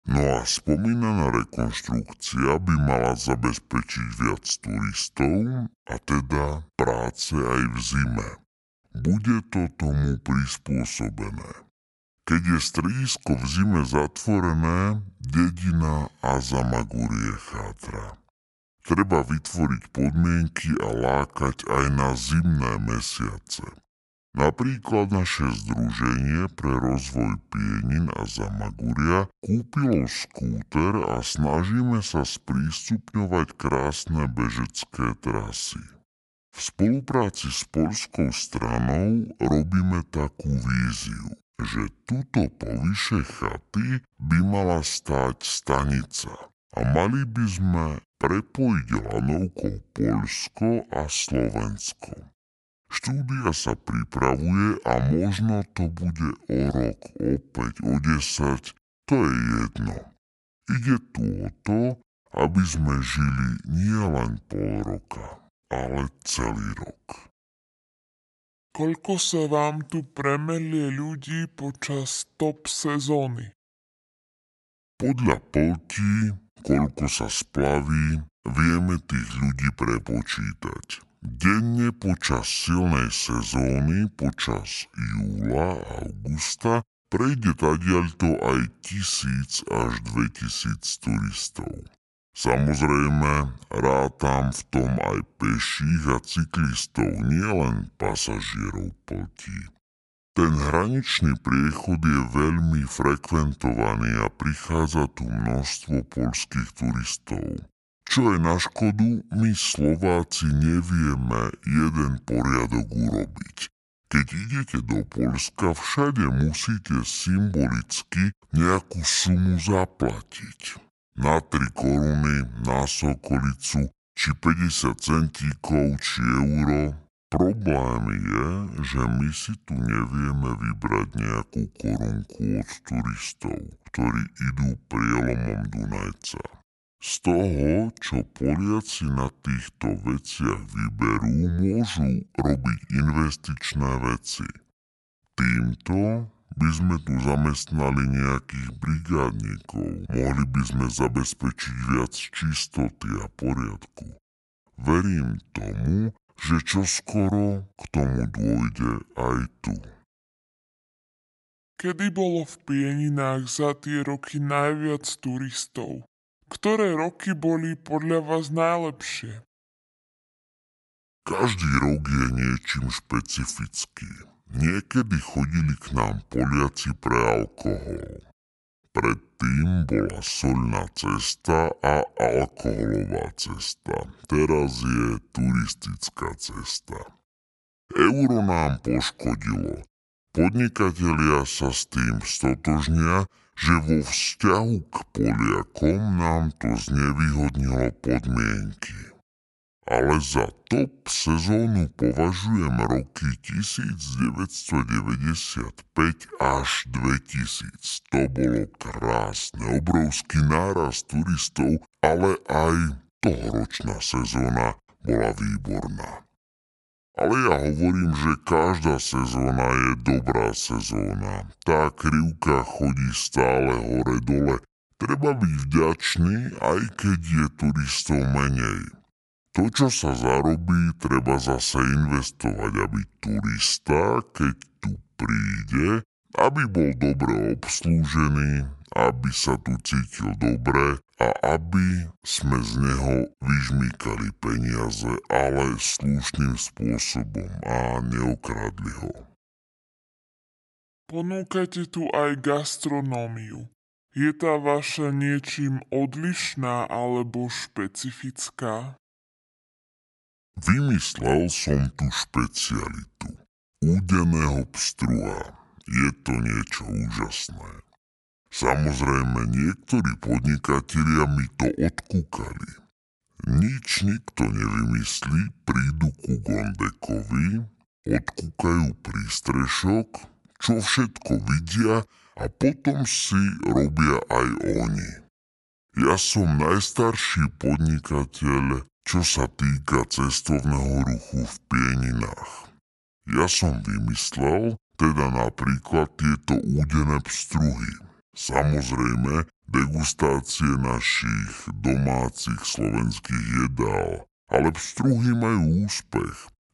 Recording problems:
wrong speed and pitch; too slow and too low; 0.6 times normal speed

